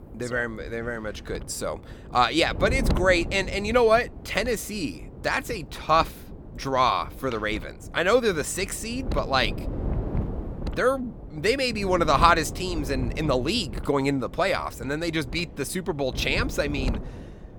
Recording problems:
wind noise on the microphone; occasional gusts; 20 dB below the speech

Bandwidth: 18 kHz